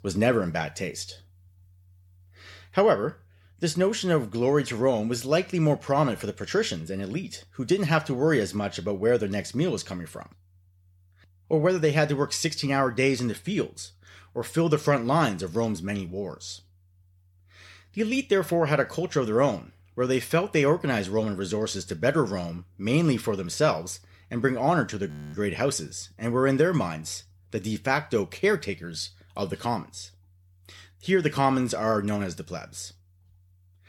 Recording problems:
audio freezing; at 25 s

